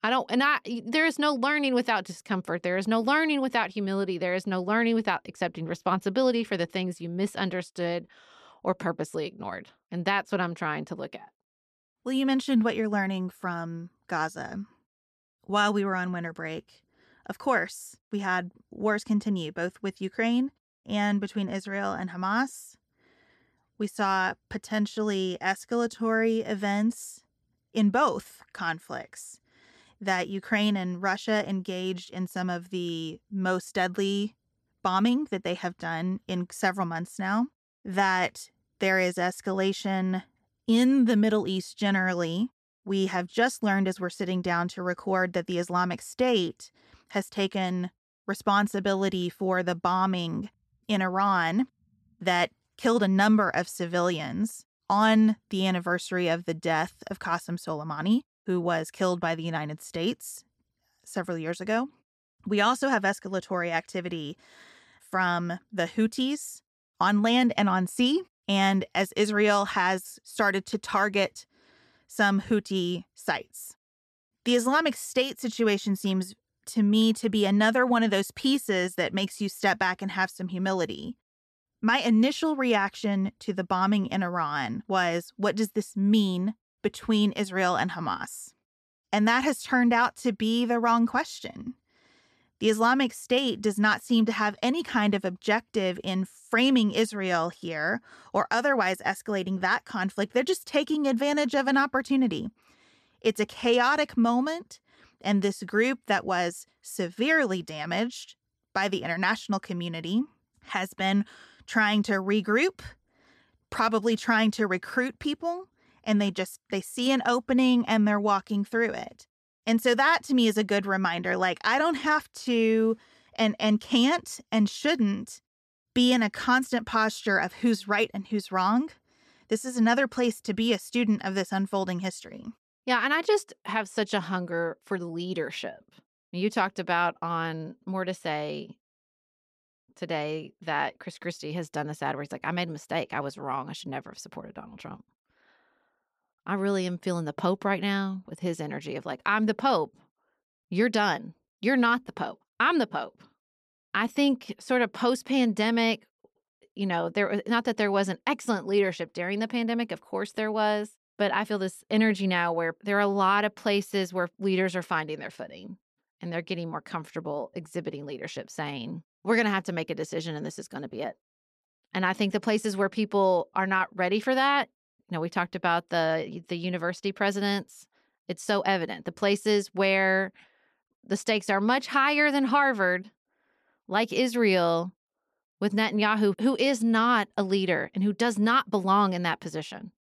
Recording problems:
none

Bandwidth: 13.5 kHz